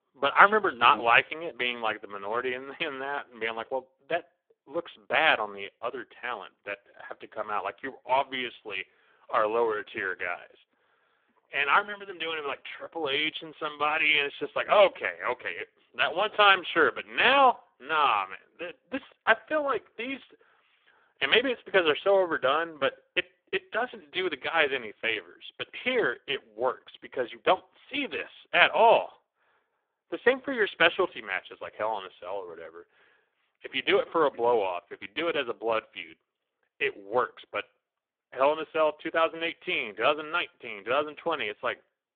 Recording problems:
phone-call audio; poor line

